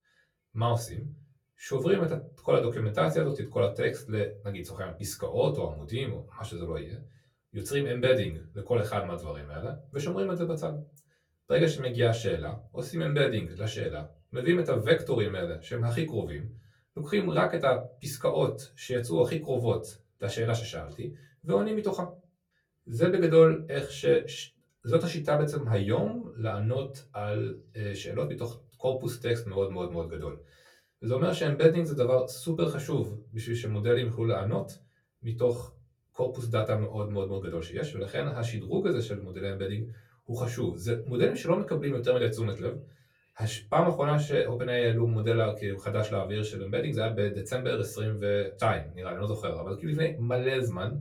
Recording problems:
off-mic speech; far
room echo; very slight; dies away in 0.3 s

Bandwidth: 17.5 kHz